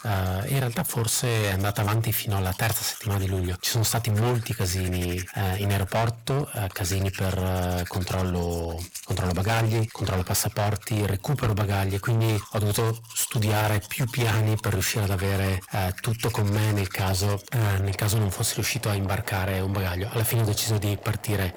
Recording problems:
distortion; heavy; 19% of the sound clipped
household noises; noticeable; throughout; 15 dB below the speech

